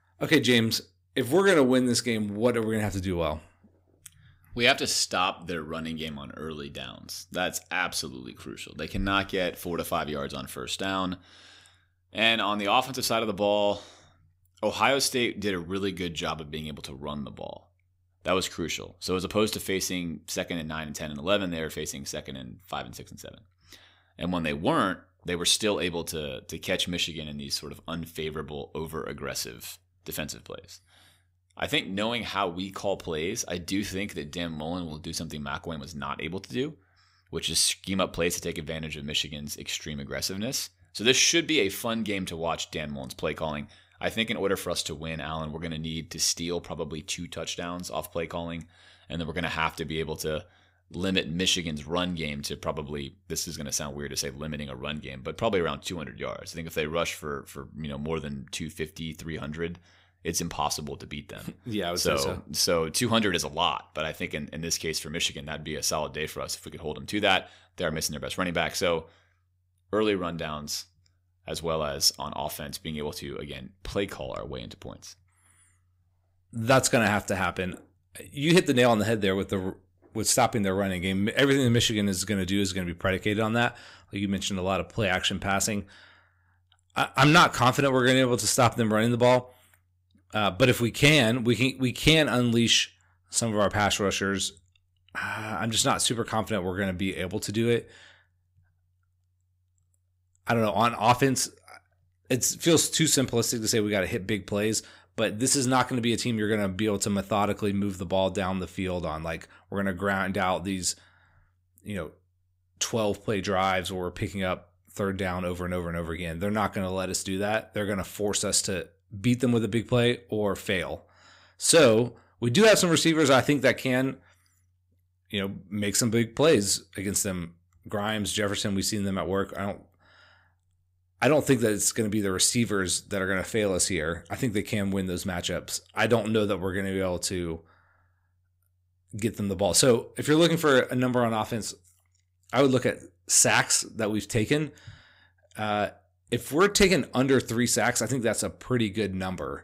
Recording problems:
none

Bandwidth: 15.5 kHz